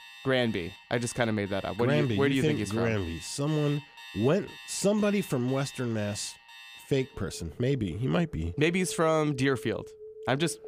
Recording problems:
alarms or sirens; noticeable; throughout; 15 dB below the speech

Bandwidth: 15 kHz